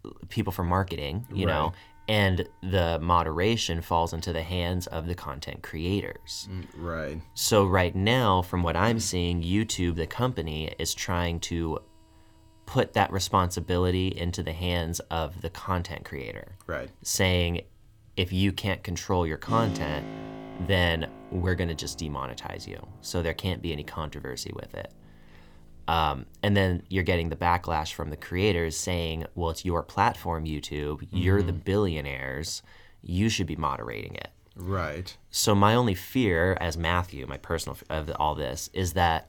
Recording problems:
background music; noticeable; throughout; 15 dB below the speech

